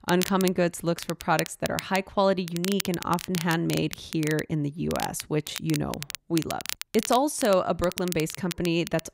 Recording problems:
crackle, like an old record; loud; 9 dB below the speech

